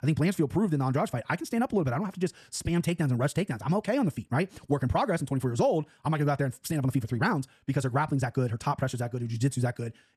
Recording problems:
wrong speed, natural pitch; too fast; 1.6 times normal speed

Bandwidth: 13.5 kHz